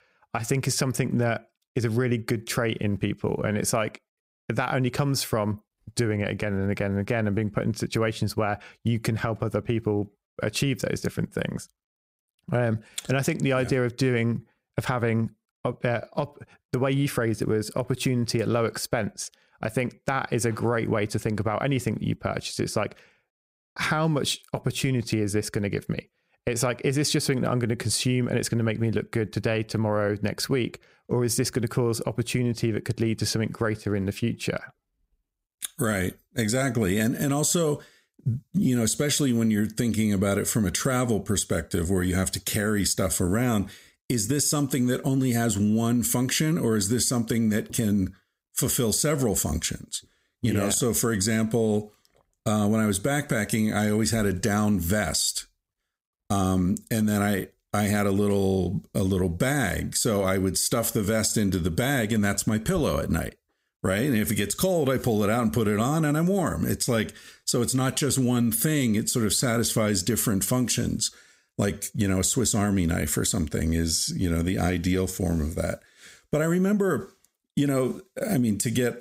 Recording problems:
squashed, flat; heavily

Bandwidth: 15.5 kHz